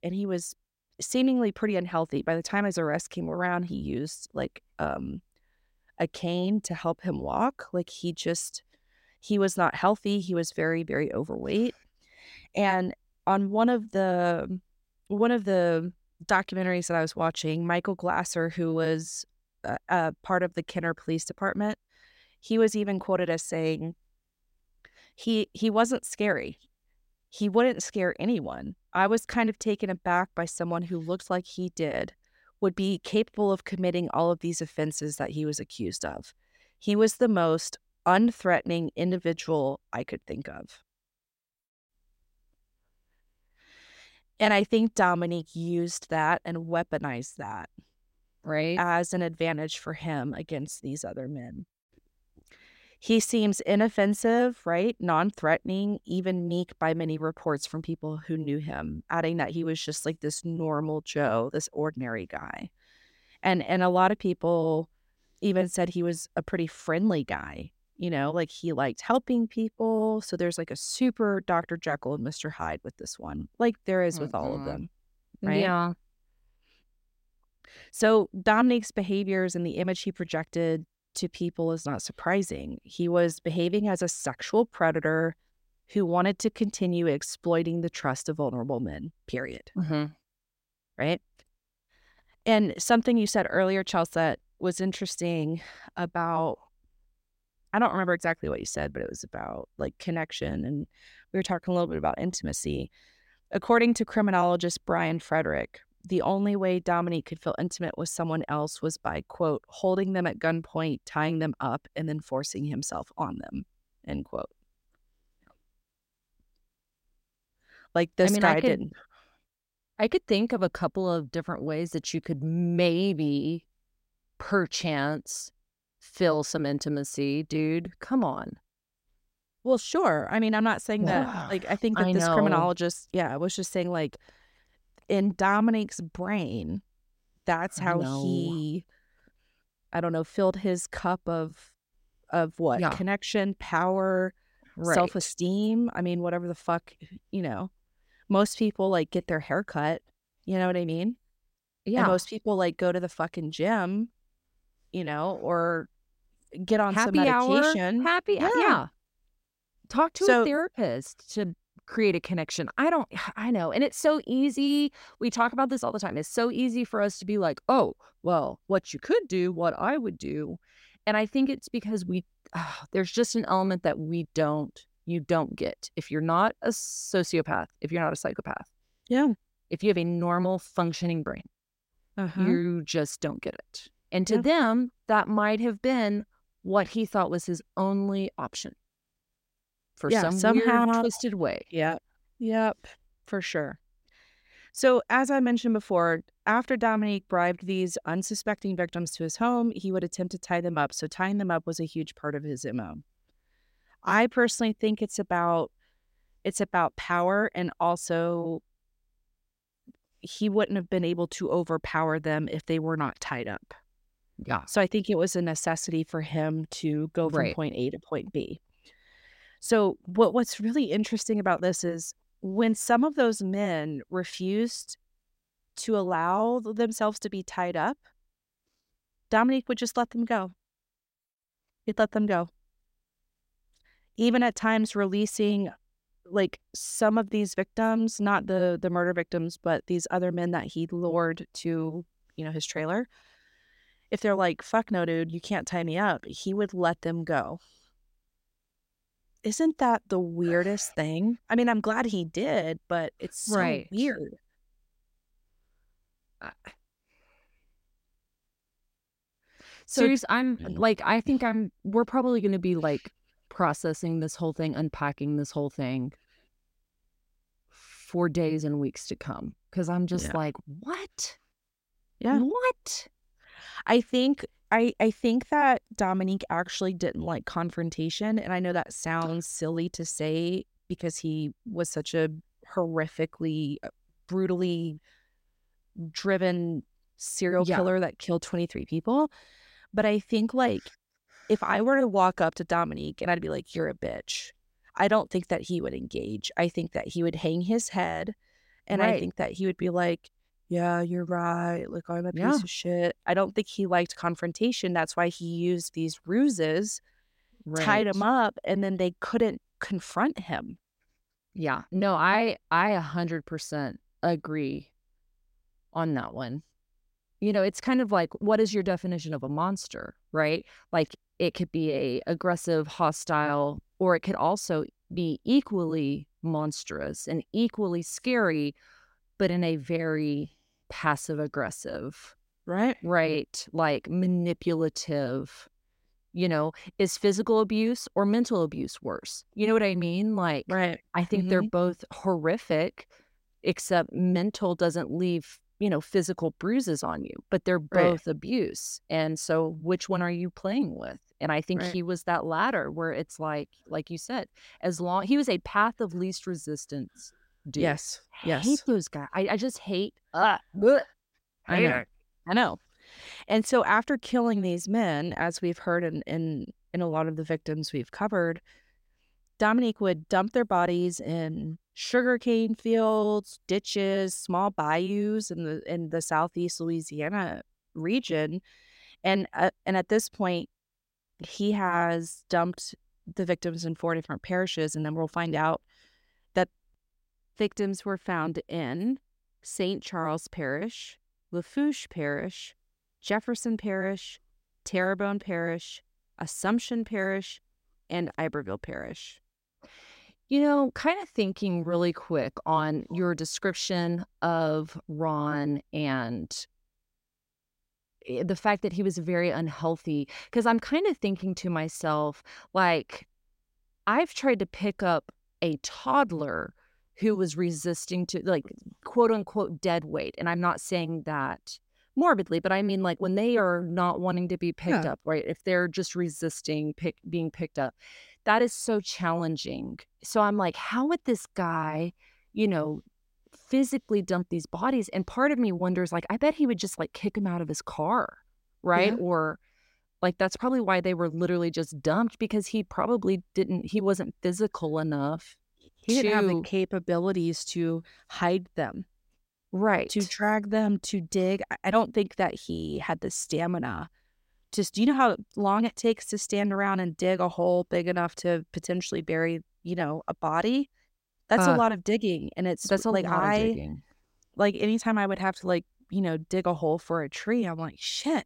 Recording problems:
none

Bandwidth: 16 kHz